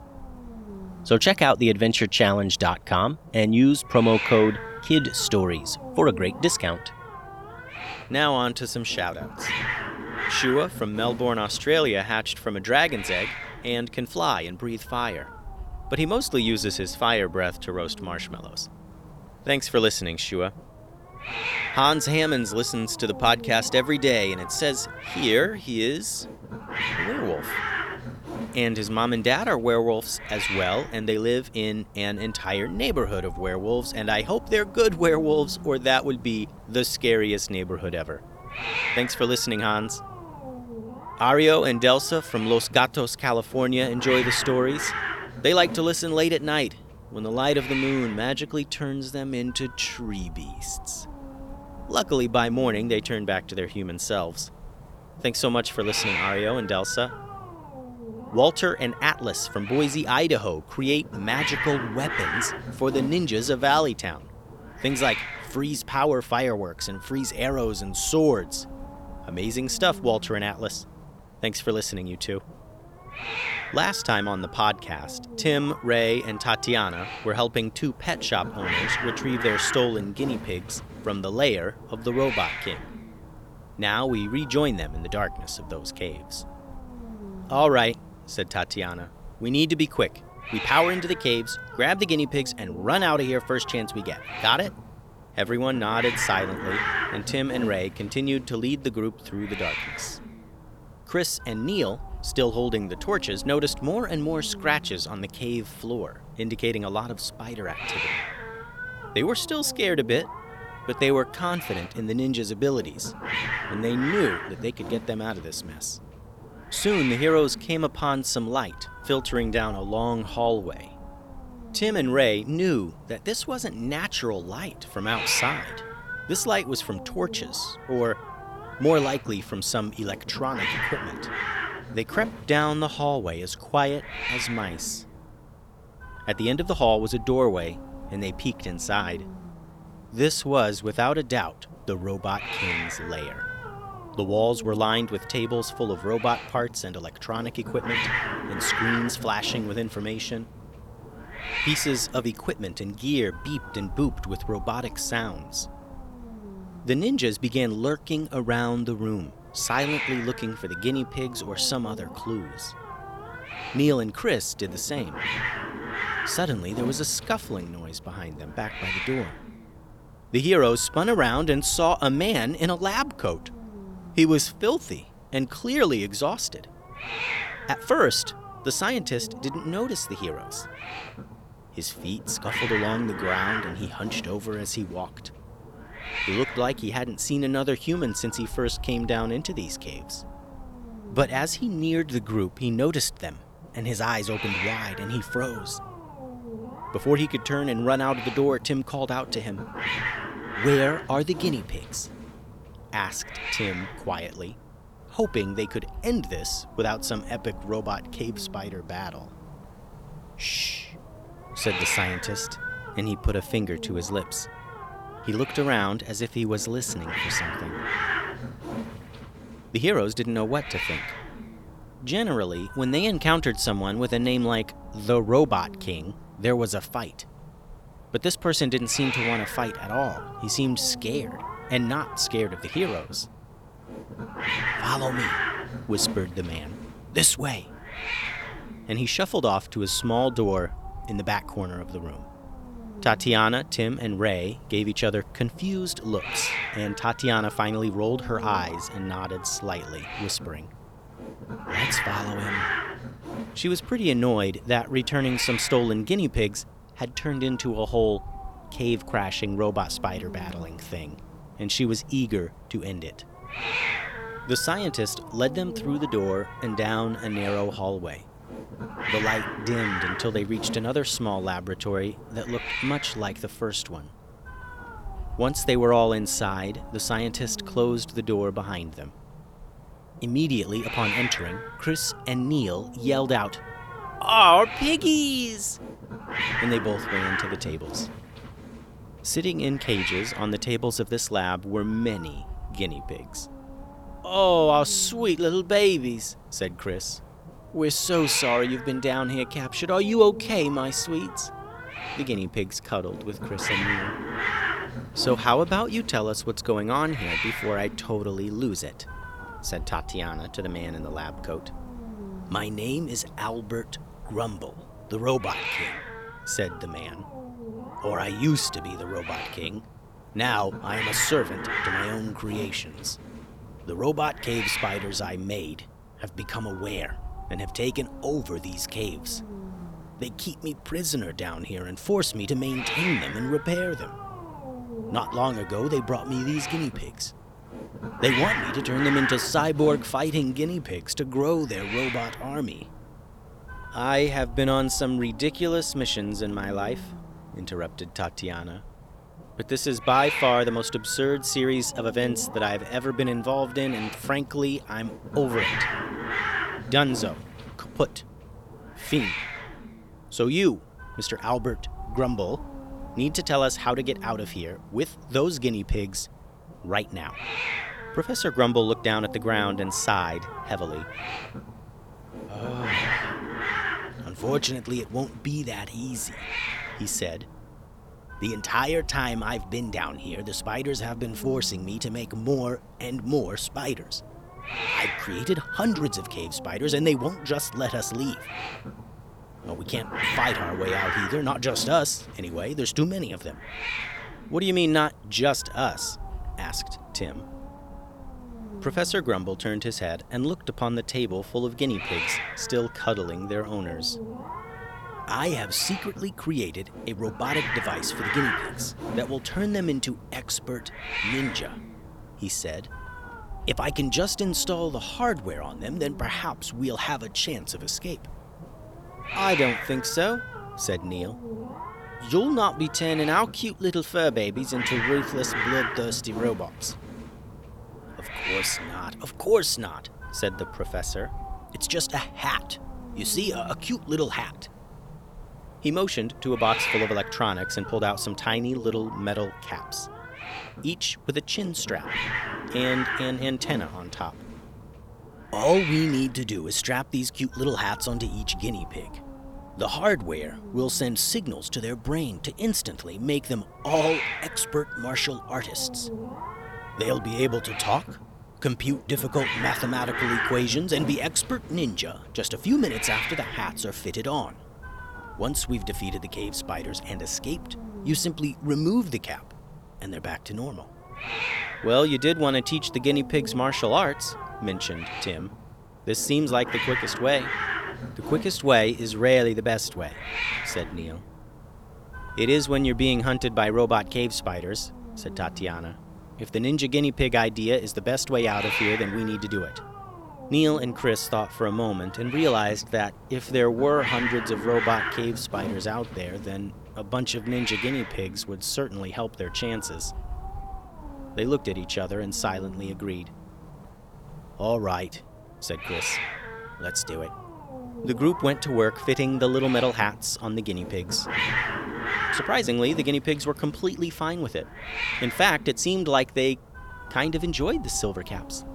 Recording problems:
hiss; loud; throughout; 7 dB below the speech

